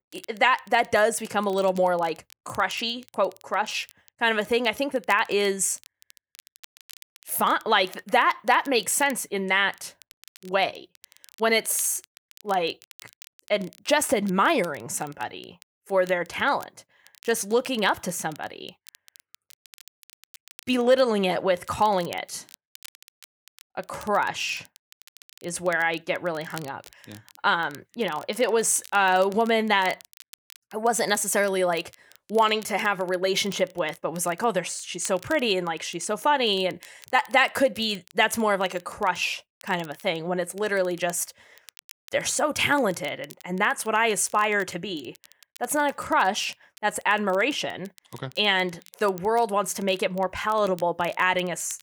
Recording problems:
crackle, like an old record; faint; 25 dB below the speech

